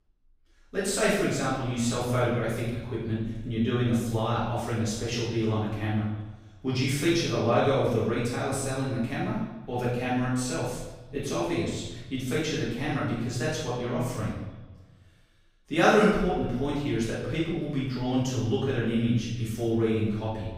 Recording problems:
room echo; strong; dies away in 0.9 s
off-mic speech; far
echo of what is said; faint; throughout; 300 ms later, 25 dB below the speech

